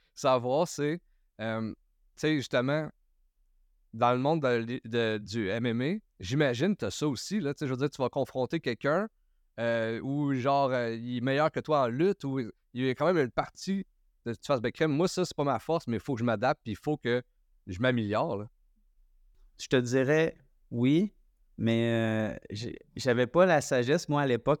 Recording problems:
none

